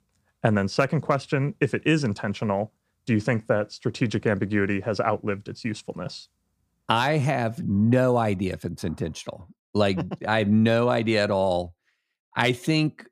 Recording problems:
none

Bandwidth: 15 kHz